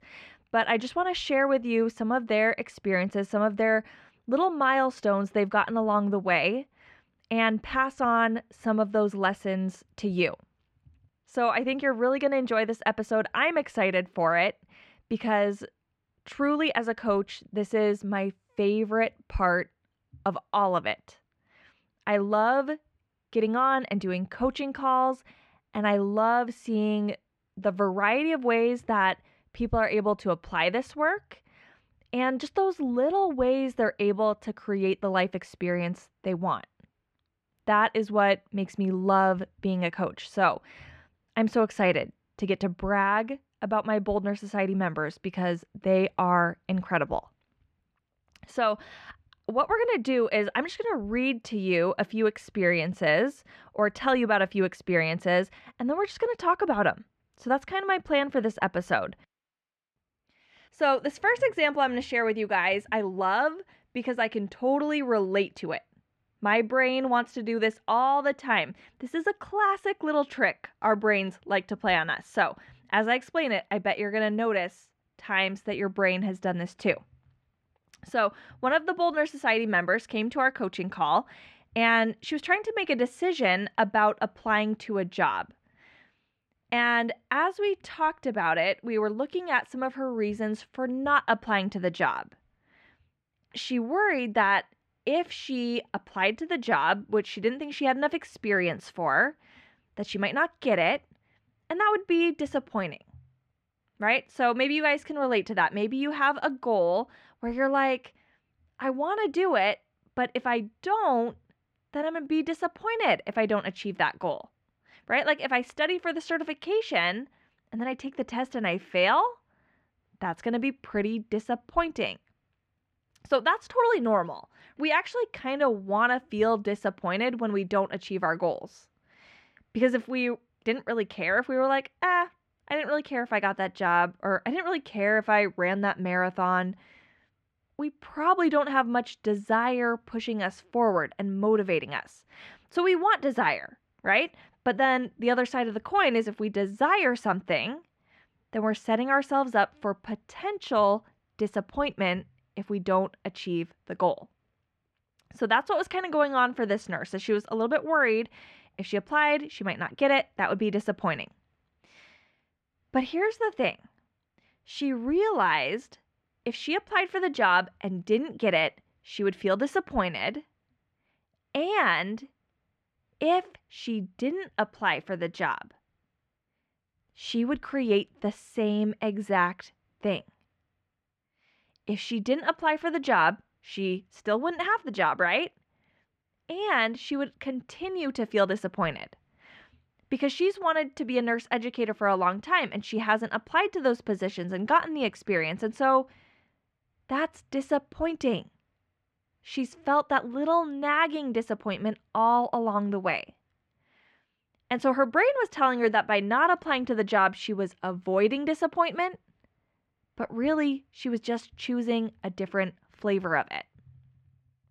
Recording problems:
muffled; slightly; fading above 2.5 kHz

